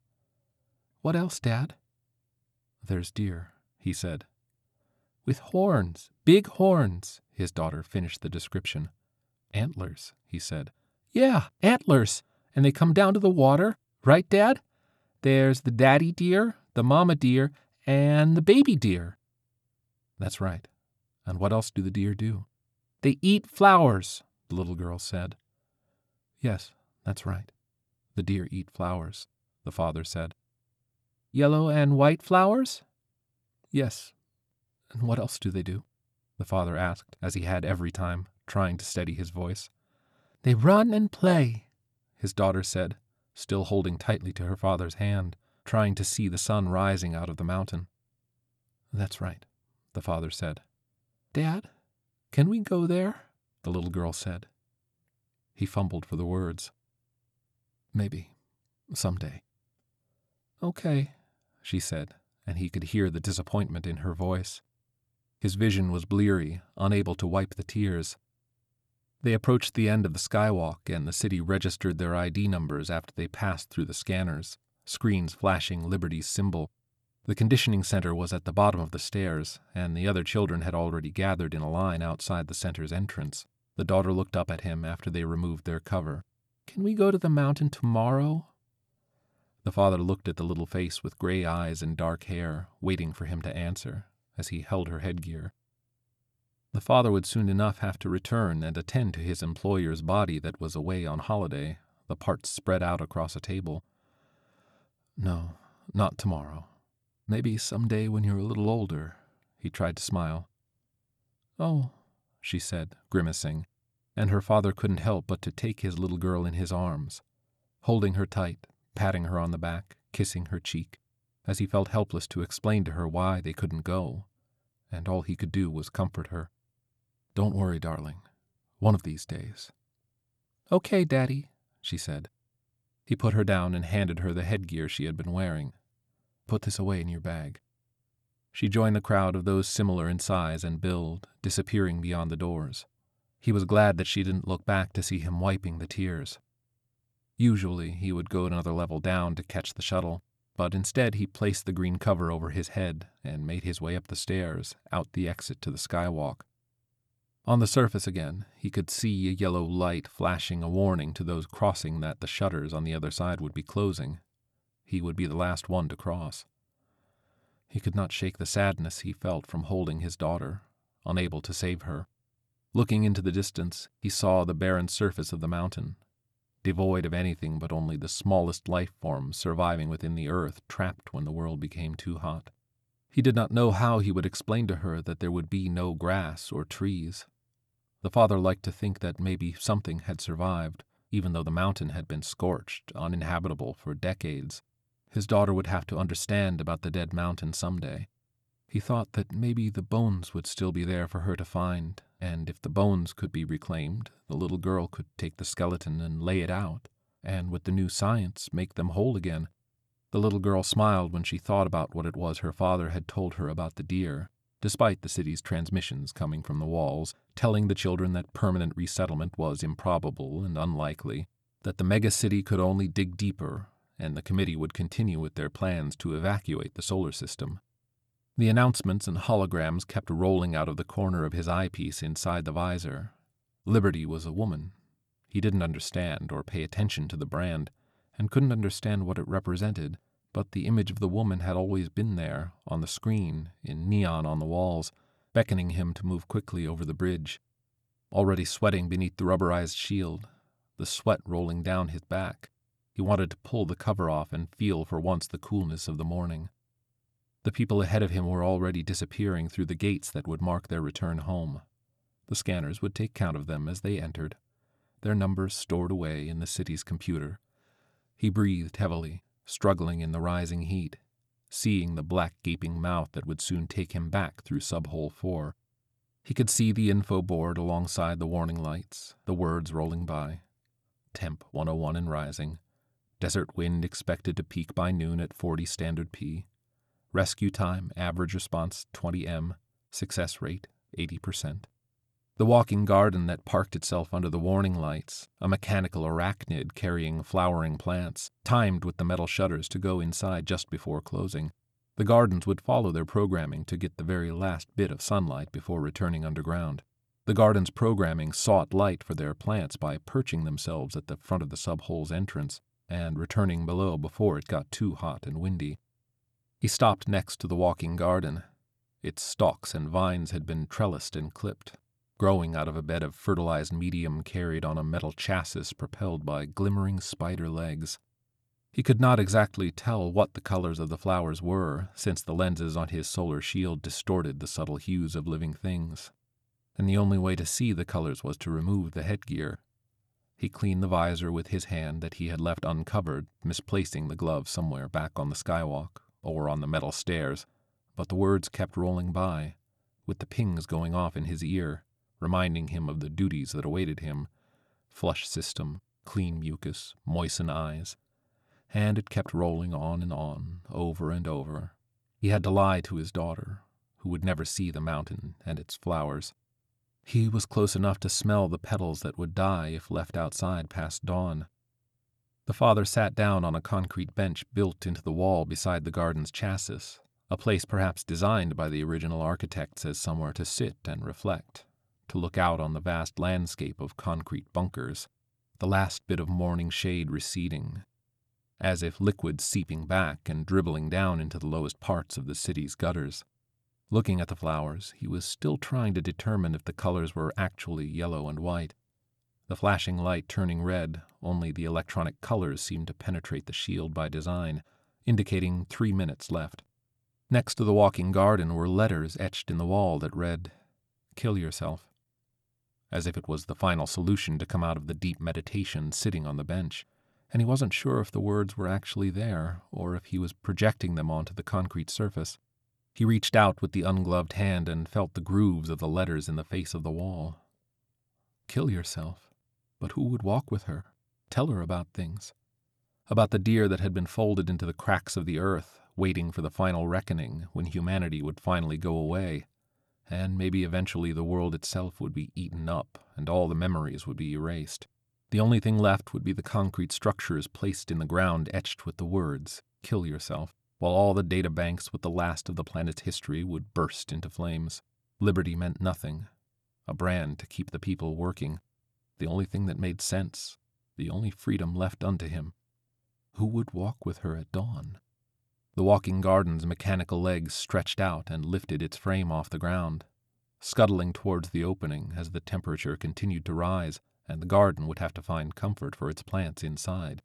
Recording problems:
none

